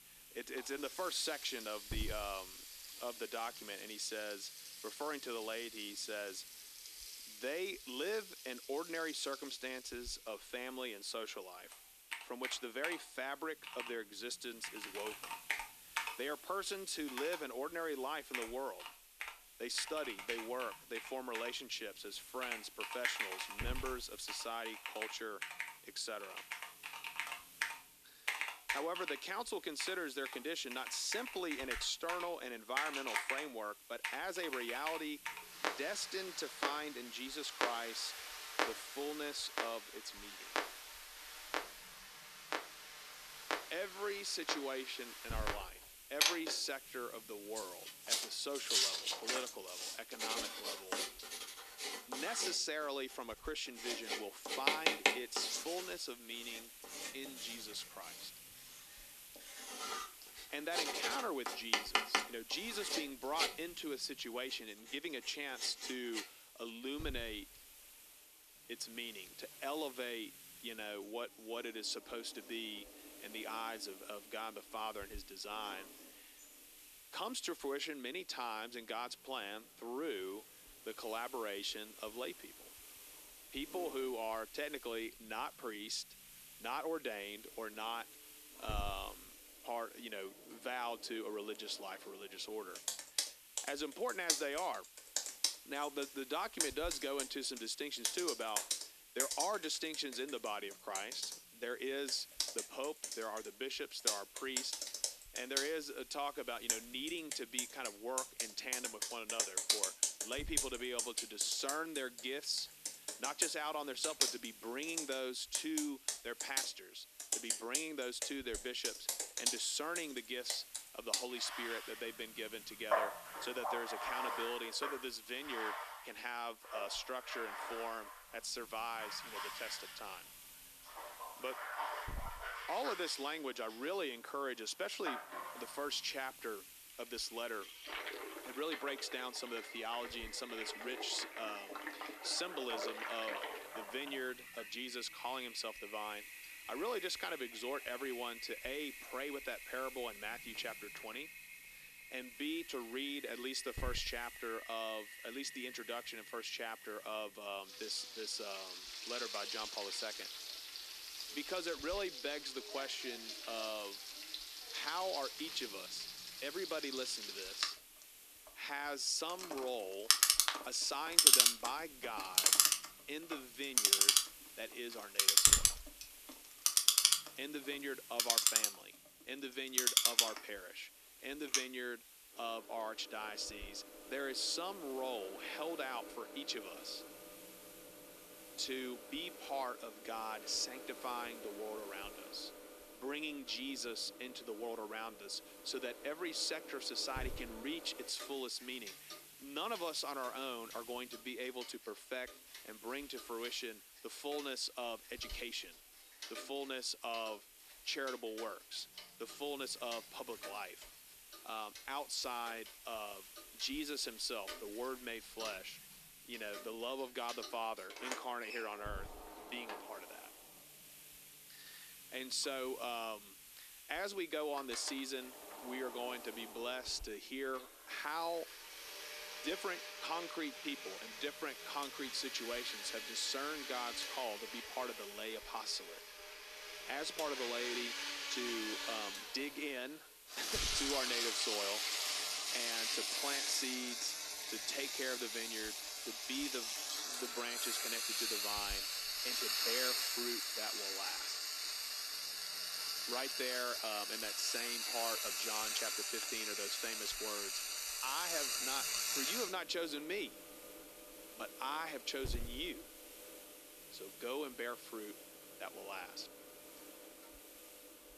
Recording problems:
thin; somewhat; fading below 300 Hz
household noises; very loud; throughout; 4 dB above the speech
hiss; noticeable; throughout; 15 dB below the speech

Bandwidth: 14 kHz